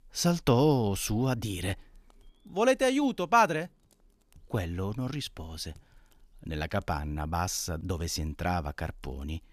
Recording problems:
none

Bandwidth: 14.5 kHz